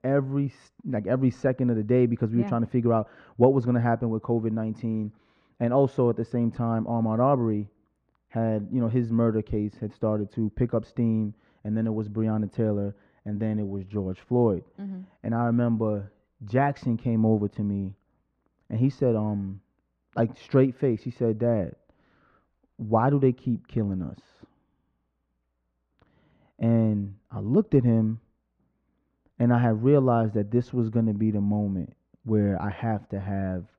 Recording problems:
muffled; very; fading above 3.5 kHz

